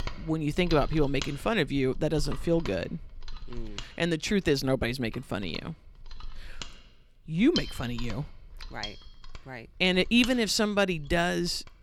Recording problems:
machinery noise; noticeable; throughout; 15 dB below the speech

